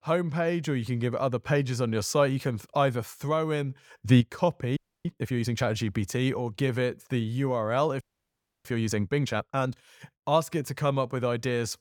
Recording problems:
audio freezing; at 5 s and at 8 s for 0.5 s

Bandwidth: 18 kHz